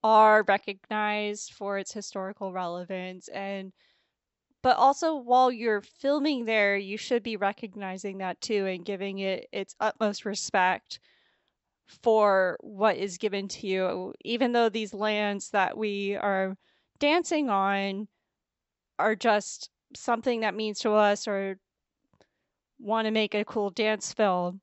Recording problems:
high frequencies cut off; noticeable; nothing above 7.5 kHz

